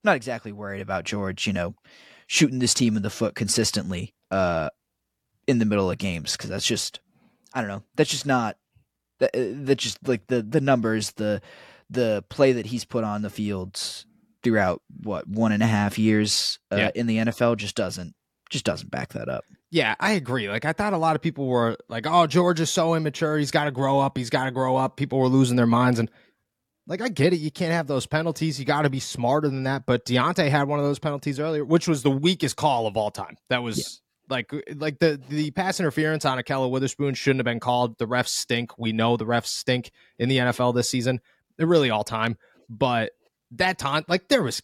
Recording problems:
none

